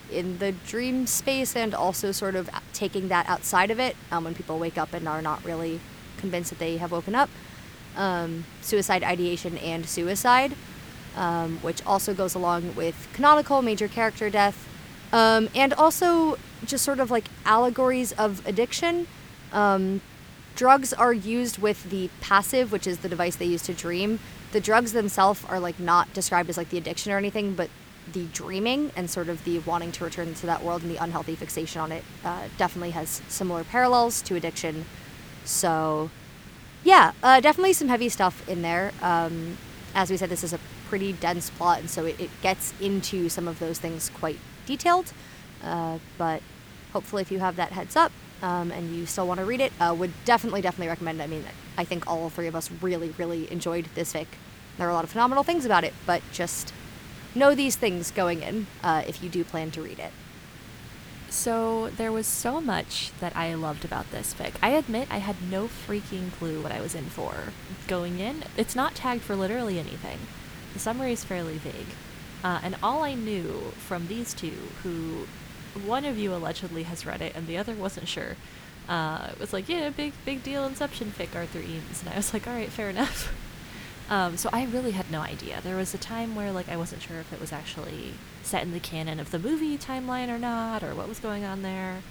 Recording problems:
hiss; noticeable; throughout; 15 dB below the speech

